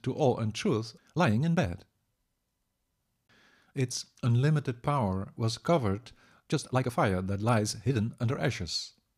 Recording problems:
uneven, jittery; strongly; from 1 to 8.5 s

